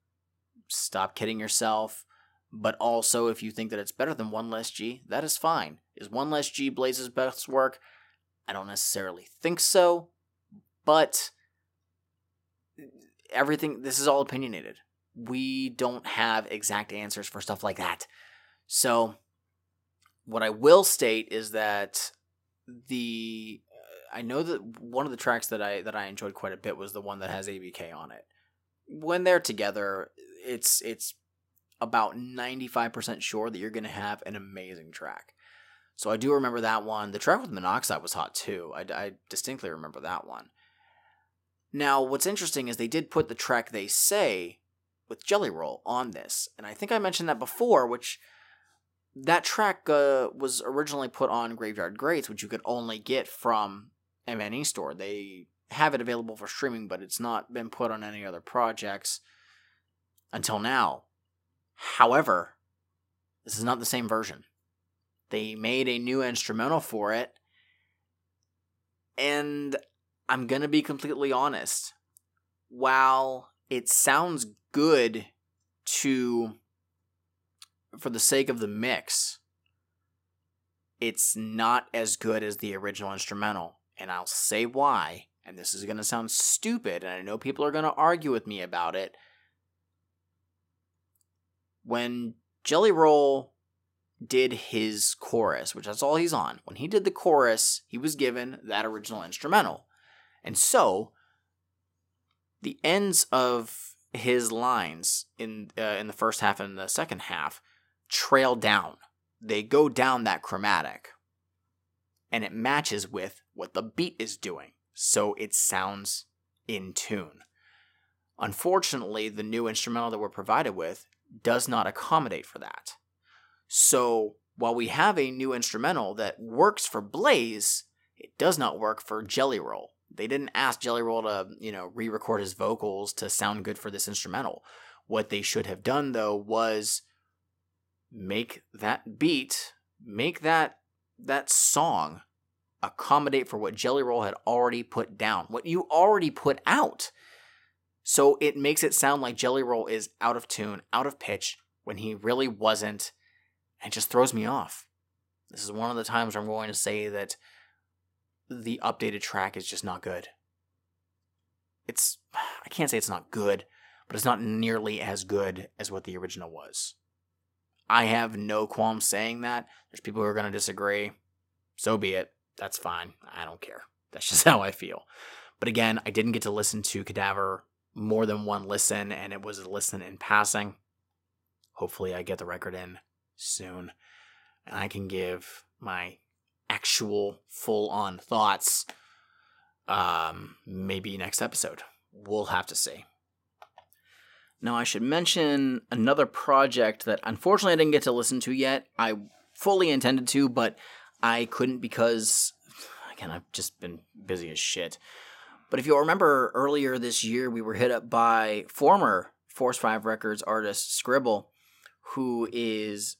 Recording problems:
none

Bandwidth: 16 kHz